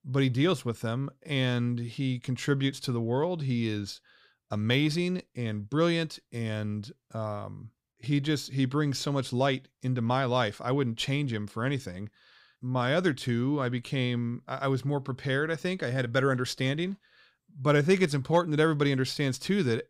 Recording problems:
none

